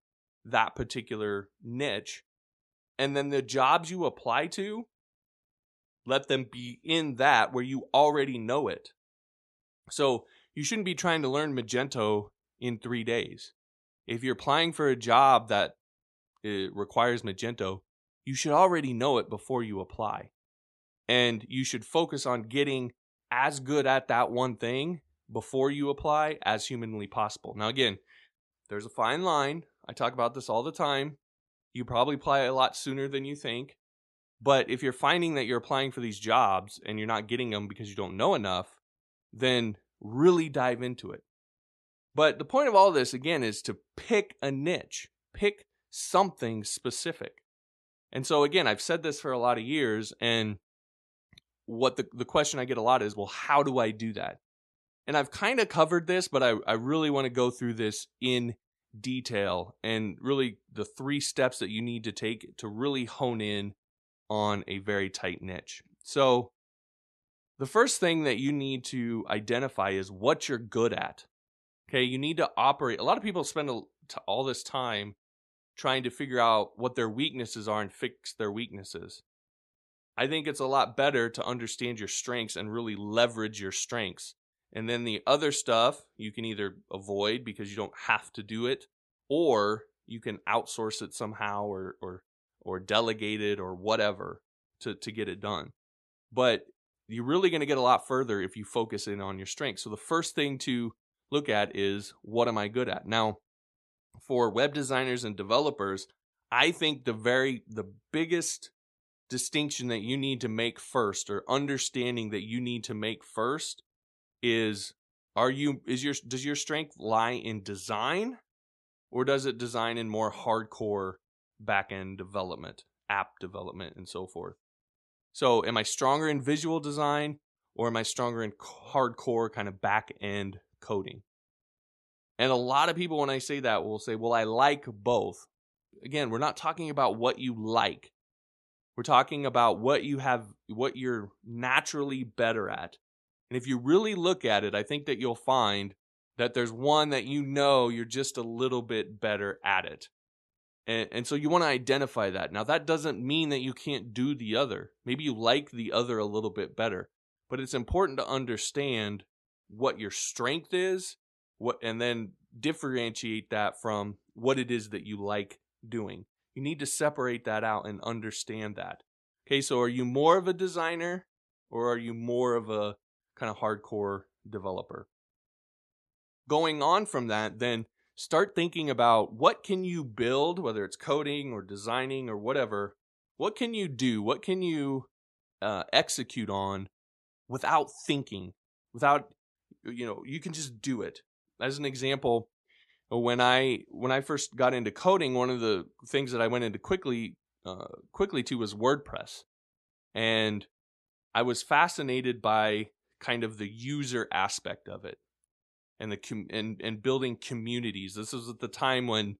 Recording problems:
none

